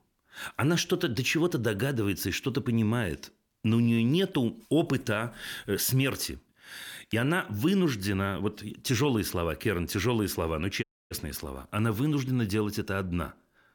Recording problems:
audio cutting out; at 11 s

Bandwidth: 18 kHz